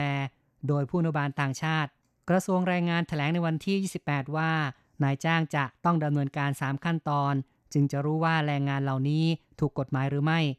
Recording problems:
abrupt cut into speech; at the start

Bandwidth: 14 kHz